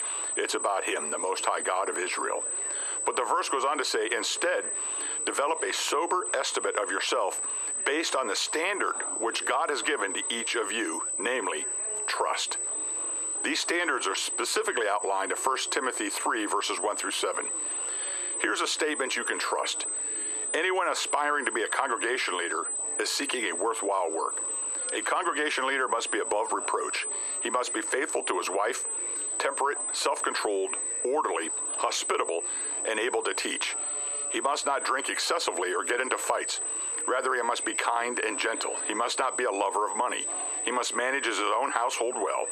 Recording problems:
squashed, flat; heavily, background pumping
thin; somewhat; fading below 300 Hz
muffled; very slightly; fading above 3.5 kHz
high-pitched whine; loud; throughout; 8 kHz, 4 dB below the speech
chatter from many people; faint; throughout; 20 dB below the speech

